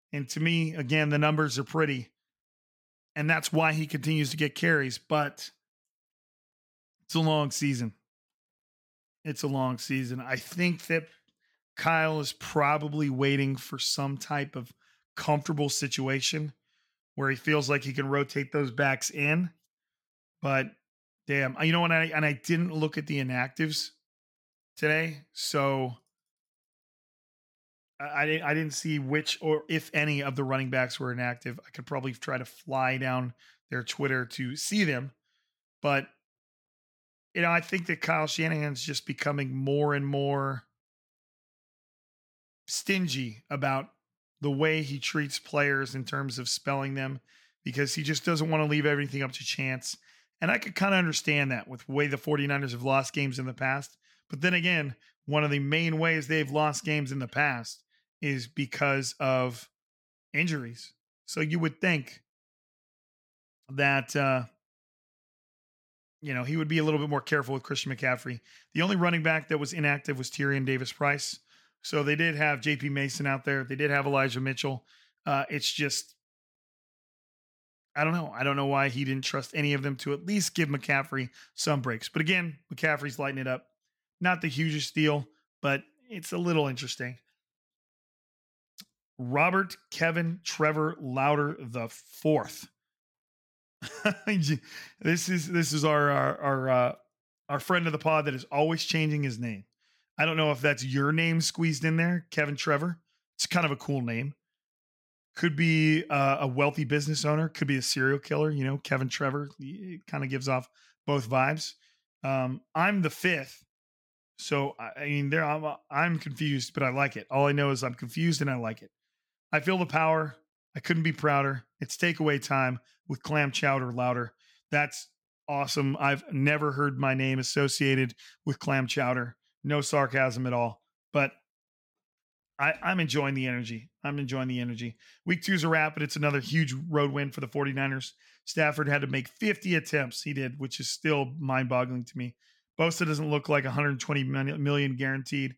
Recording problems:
none

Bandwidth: 17 kHz